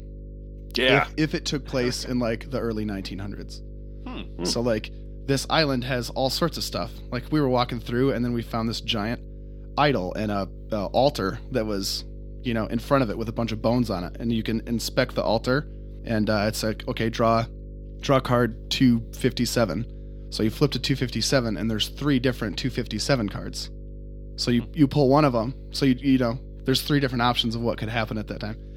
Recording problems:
electrical hum; faint; throughout; 50 Hz, 25 dB below the speech

